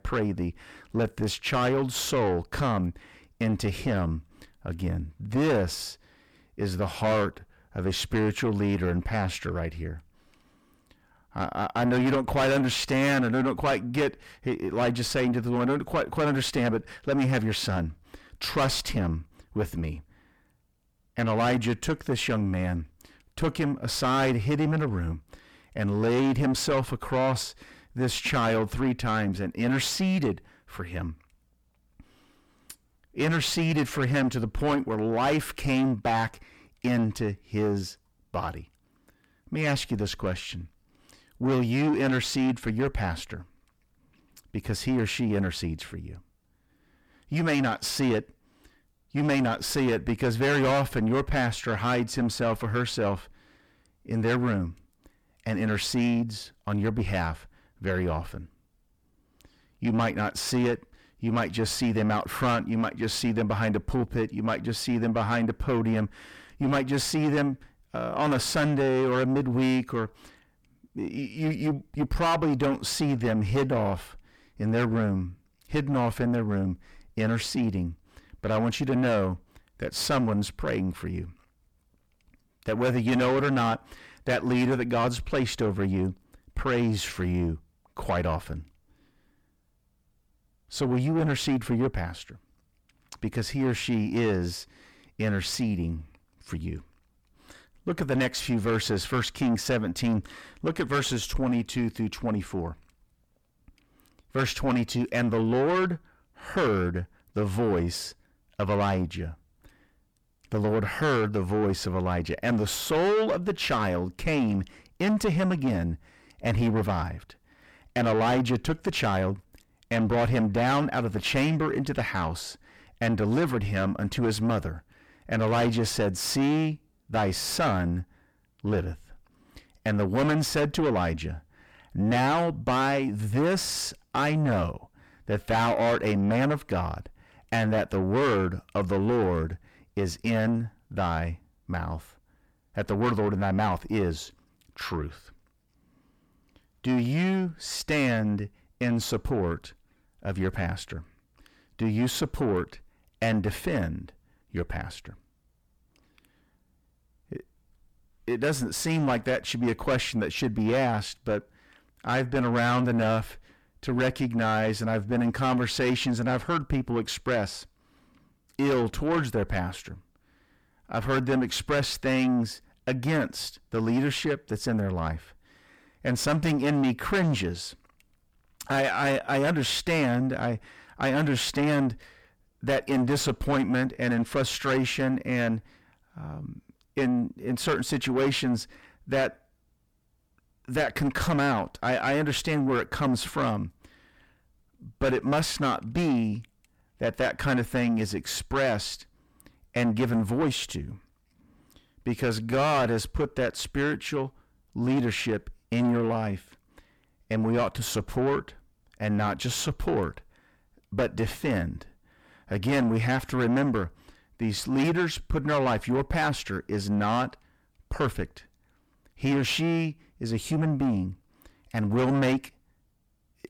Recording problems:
distortion; heavy; 5 dB below the speech

